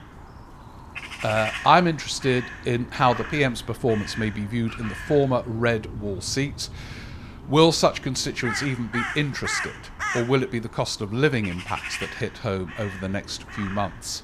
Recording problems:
animal sounds; loud; throughout; 10 dB below the speech

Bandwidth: 14.5 kHz